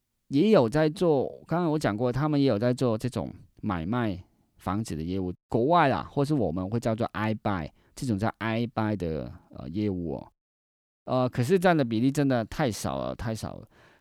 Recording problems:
none

